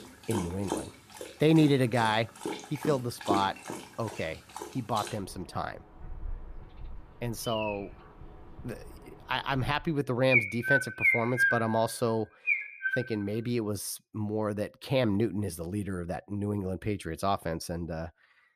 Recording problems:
animal sounds; loud; until 14 s; as loud as the speech

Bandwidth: 14.5 kHz